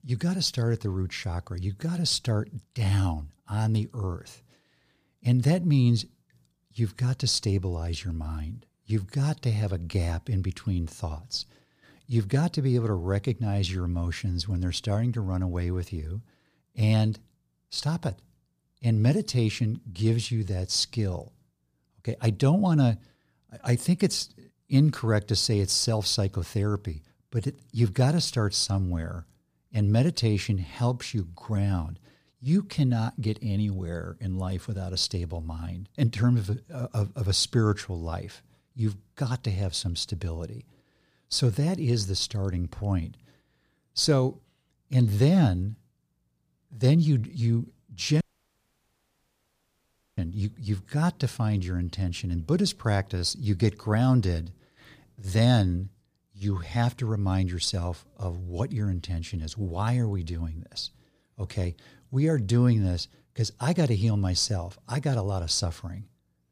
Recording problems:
audio cutting out; at 48 s for 2 s

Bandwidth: 15 kHz